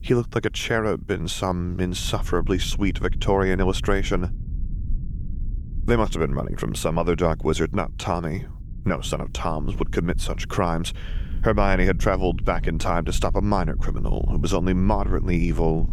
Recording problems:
low rumble; faint; throughout; 20 dB below the speech

